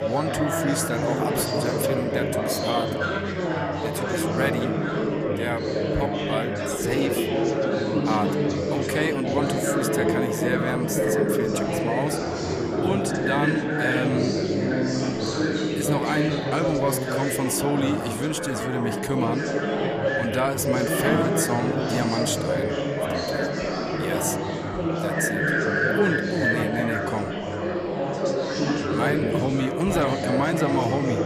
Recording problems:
chatter from many people; very loud; throughout; 3 dB above the speech

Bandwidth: 15 kHz